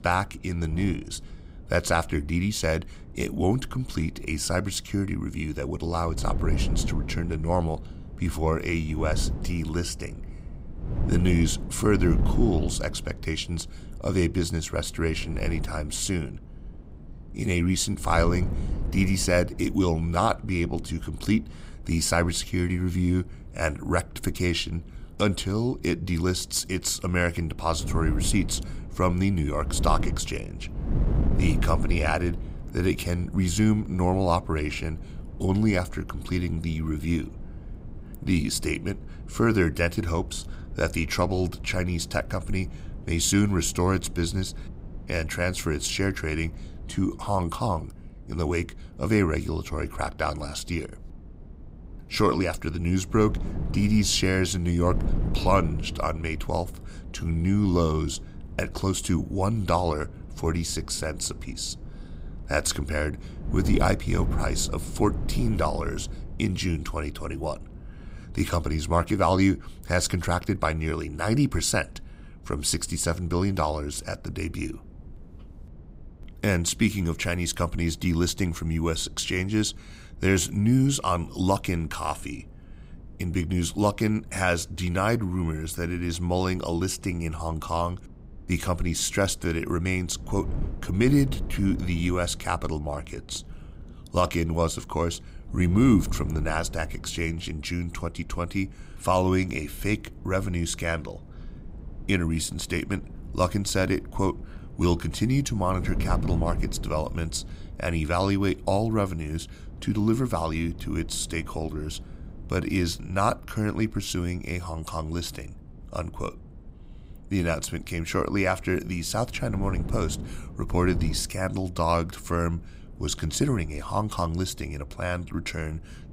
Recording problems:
wind noise on the microphone; occasional gusts; 20 dB below the speech

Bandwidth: 15.5 kHz